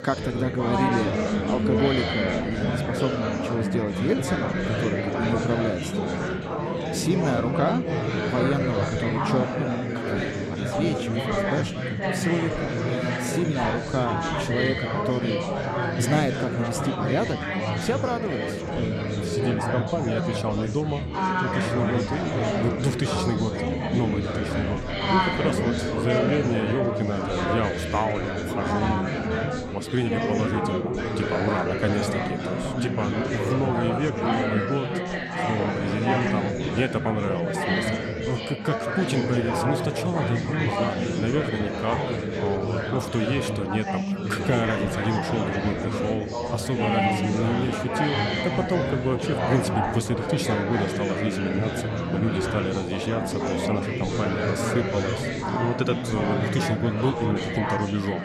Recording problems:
chatter from many people; very loud; throughout; 2 dB above the speech

